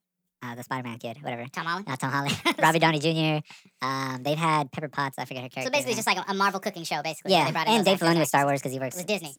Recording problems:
wrong speed and pitch; too fast and too high; 1.5 times normal speed

